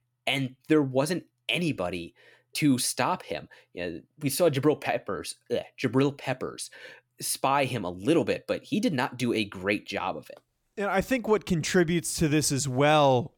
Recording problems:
none

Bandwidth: 18.5 kHz